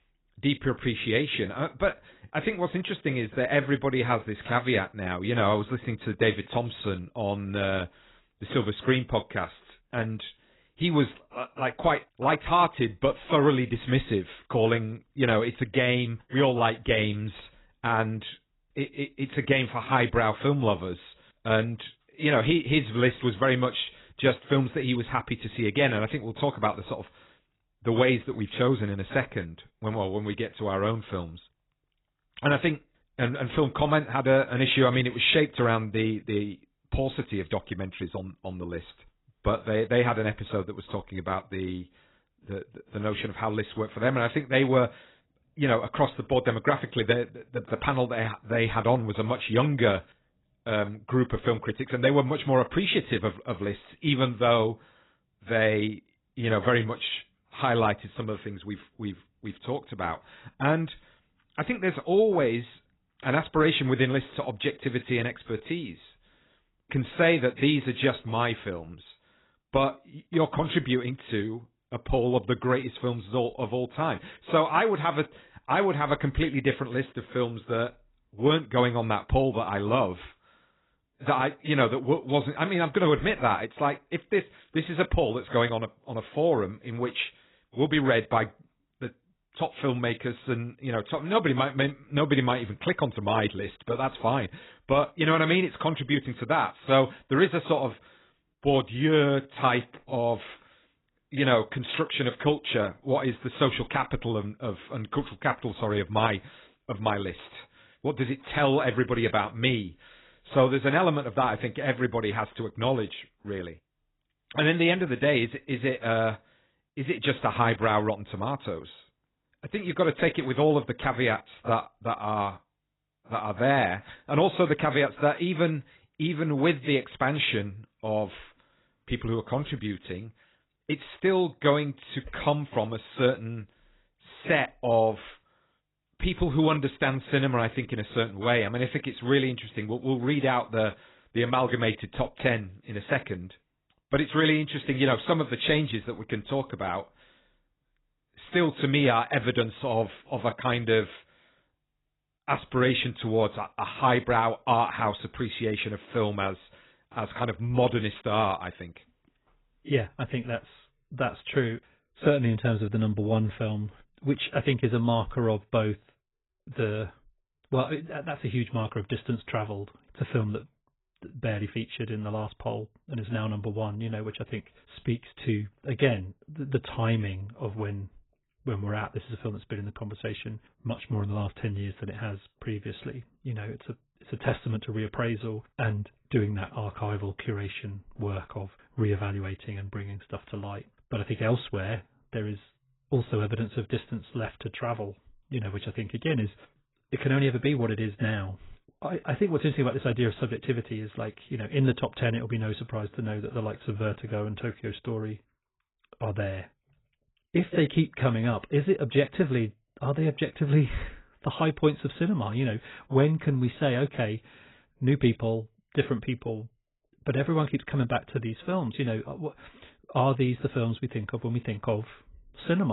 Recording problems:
garbled, watery; badly; nothing above 4 kHz
abrupt cut into speech; at the end

